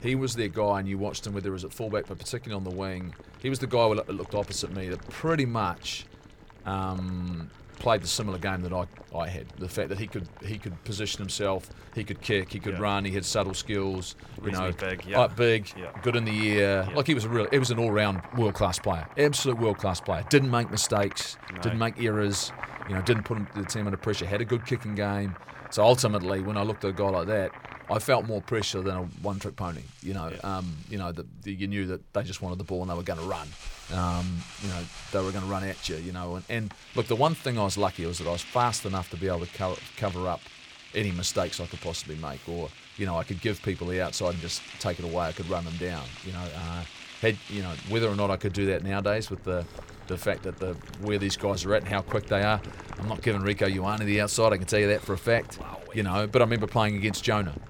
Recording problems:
household noises; noticeable; throughout; 15 dB below the speech

